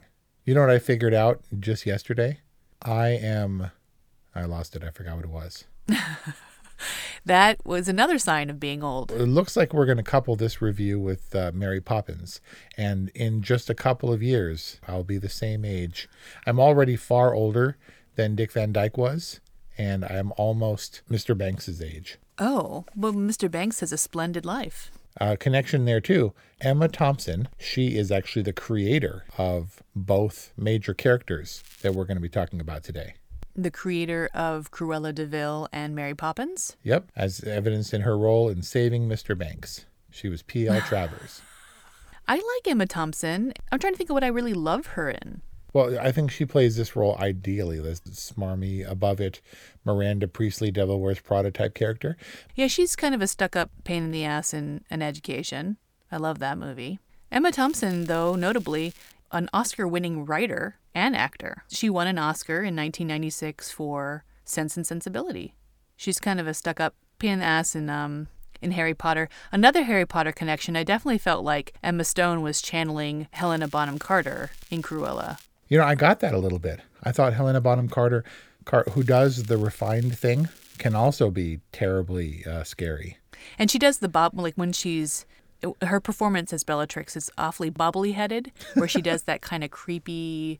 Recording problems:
crackling; faint; 4 times, first at 32 s; 25 dB below the speech

